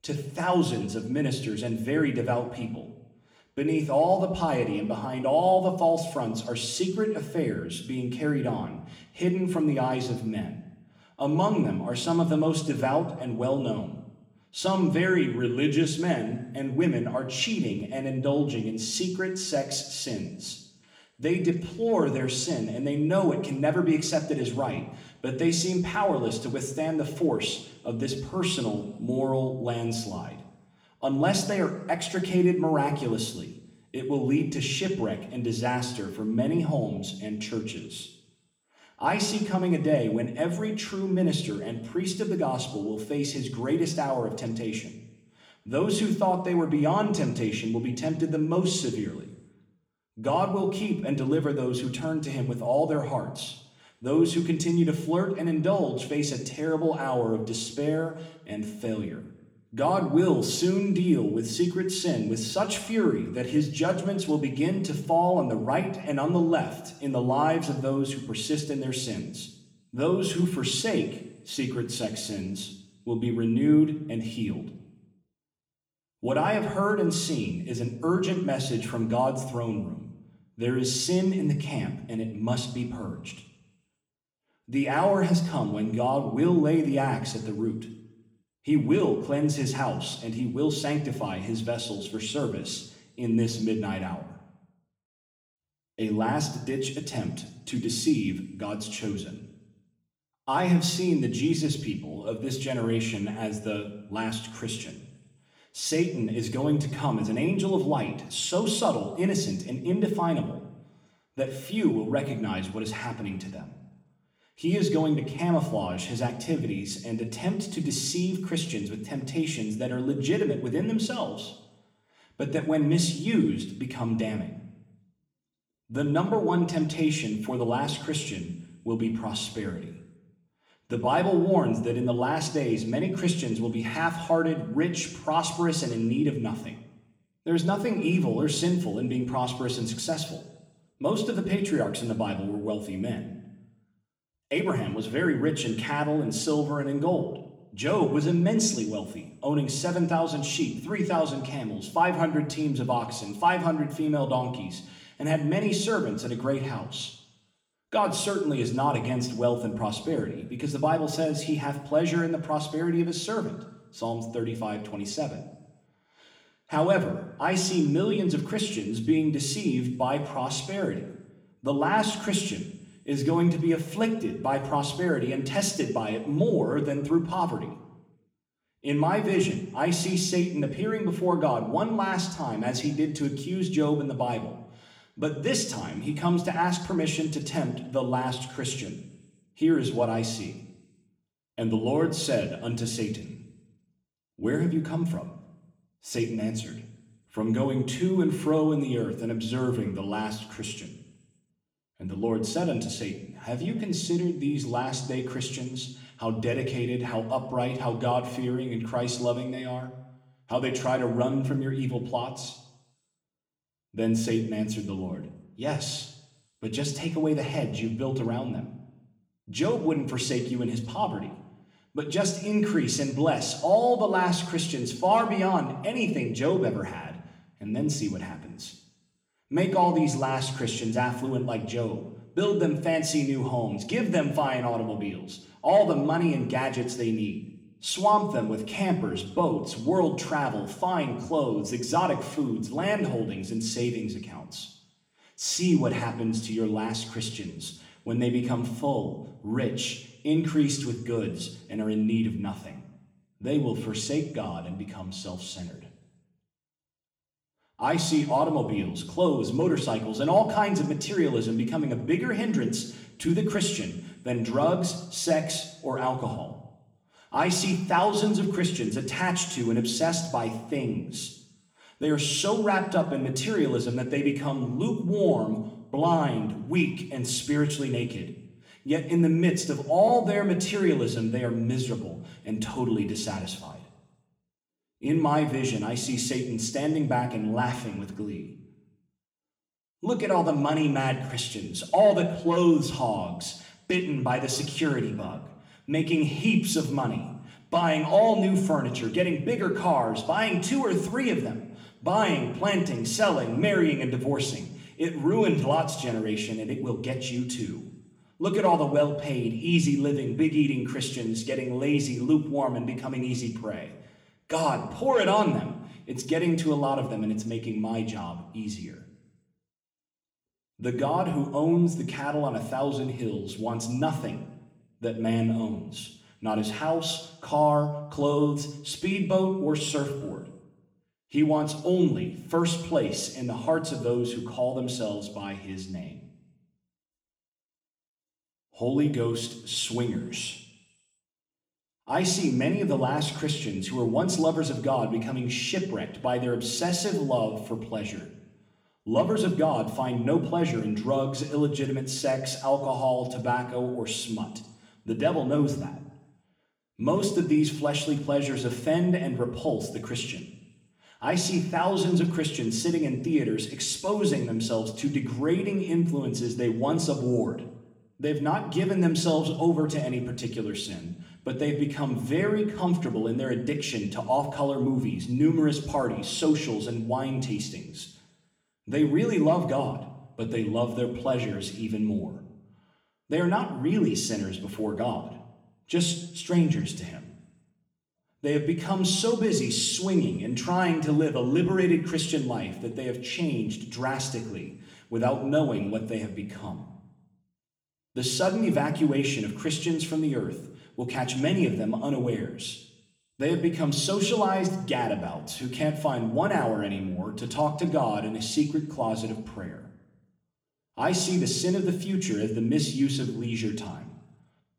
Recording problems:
room echo; slight; dies away in 0.7 s
off-mic speech; somewhat distant

